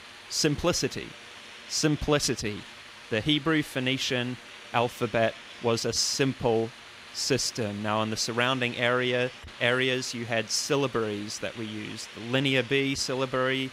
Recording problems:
hiss; noticeable; throughout; 15 dB below the speech

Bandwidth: 15.5 kHz